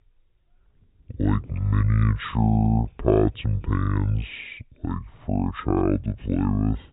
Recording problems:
high frequencies cut off; severe; nothing above 4 kHz
wrong speed and pitch; too slow and too low; 0.6 times normal speed

